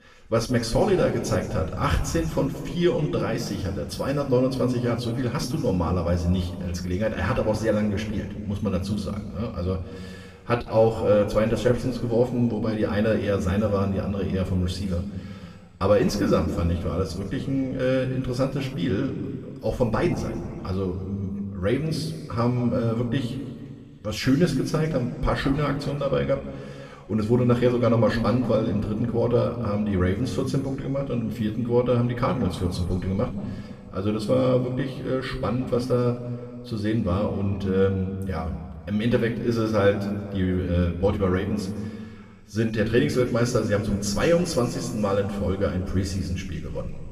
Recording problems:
room echo; slight; dies away in 1.9 s
off-mic speech; somewhat distant

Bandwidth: 14.5 kHz